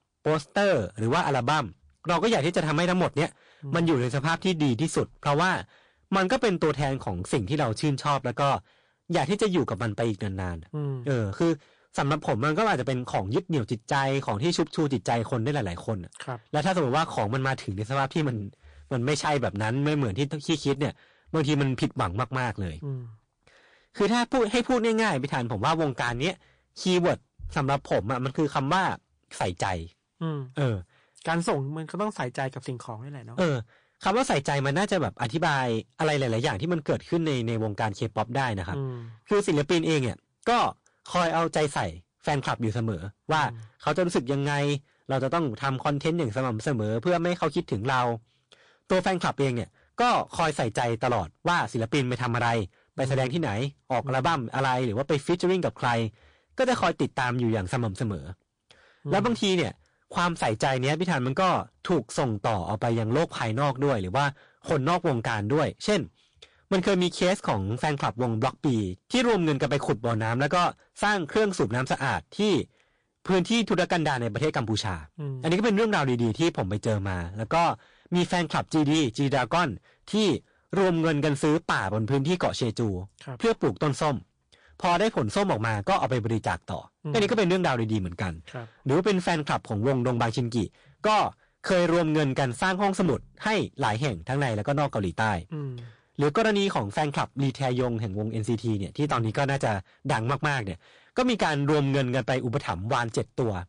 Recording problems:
distortion; heavy; 9% of the sound clipped
garbled, watery; slightly

